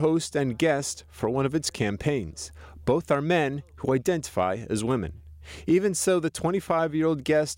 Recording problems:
abrupt cut into speech; at the start

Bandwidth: 16 kHz